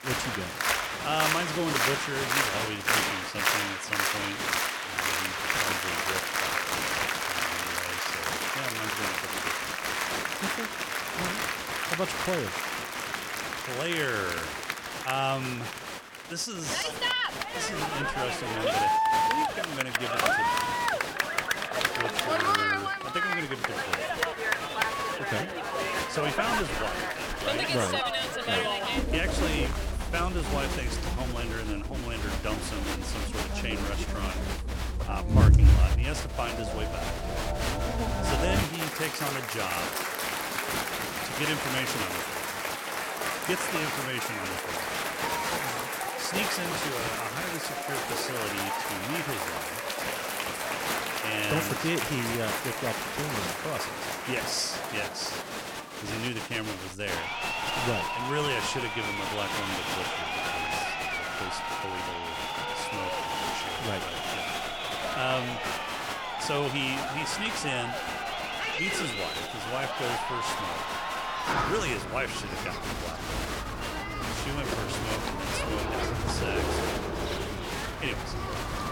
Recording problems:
crowd noise; very loud; throughout; 5 dB above the speech

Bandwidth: 17 kHz